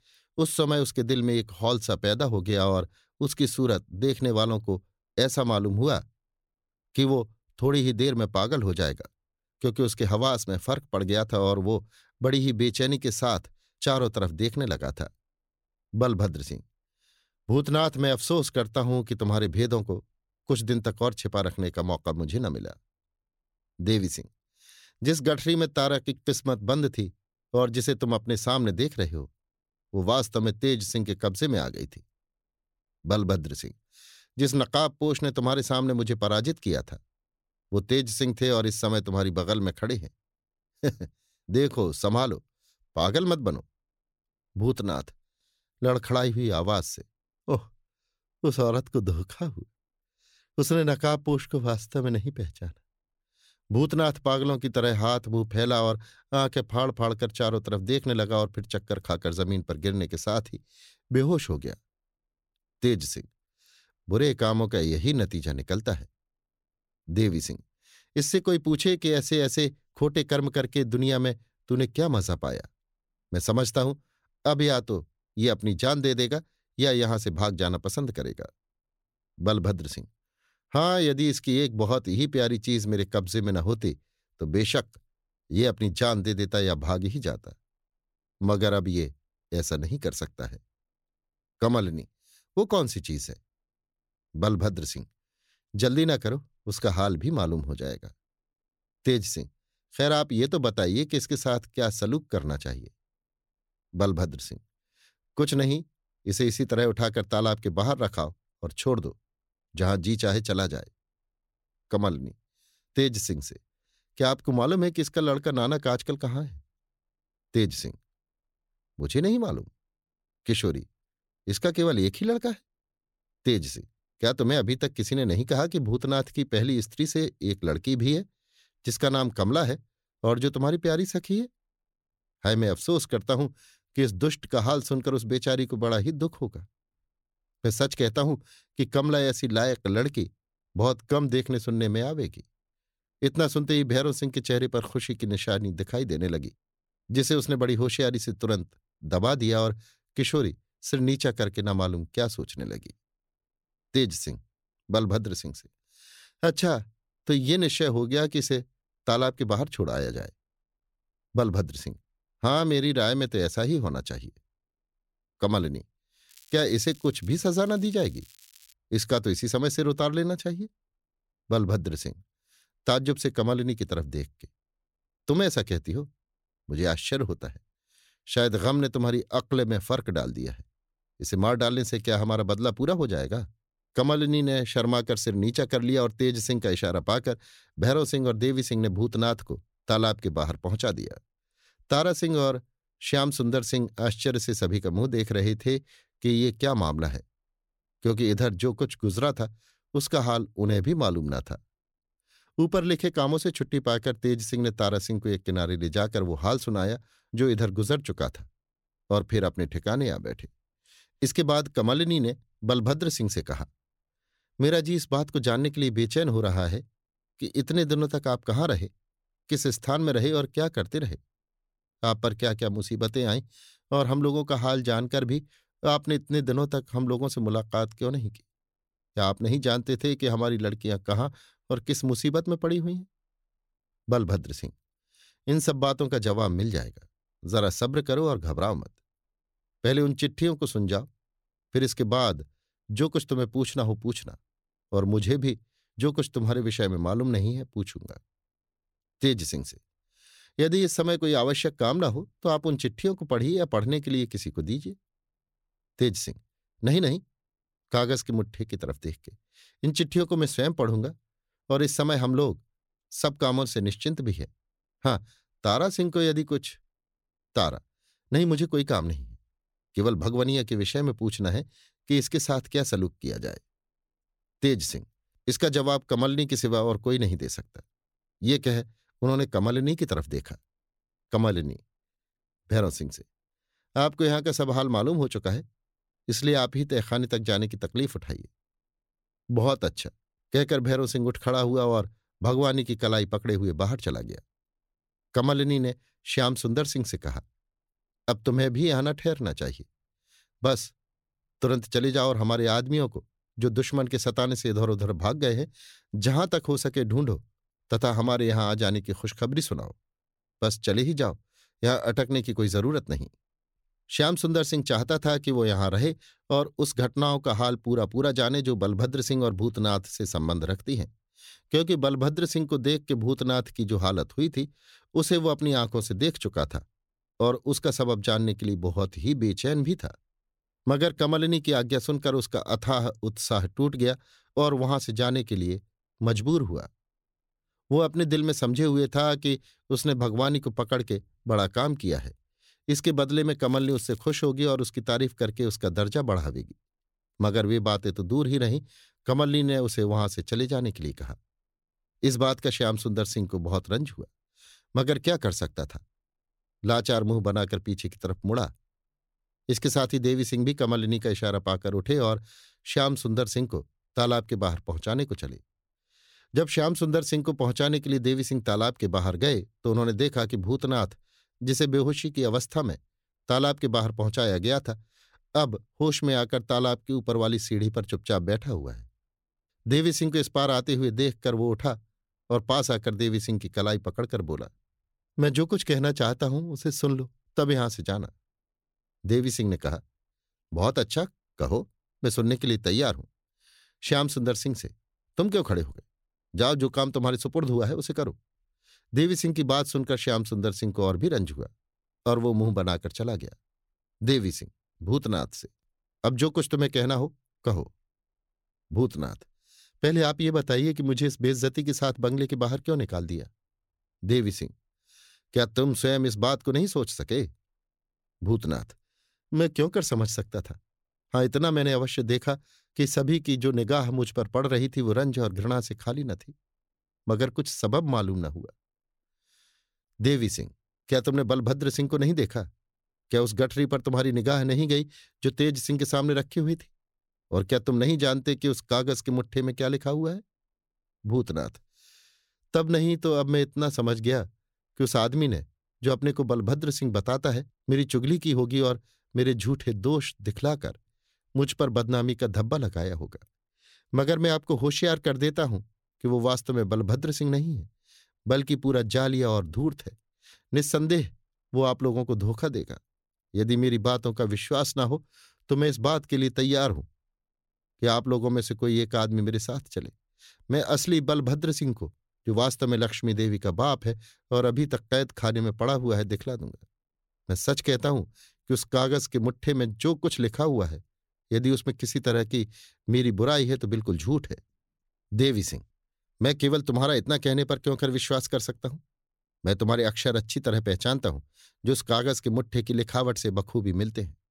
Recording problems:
crackling; faint; from 2:46 to 2:49 and at 5:44; 25 dB below the speech

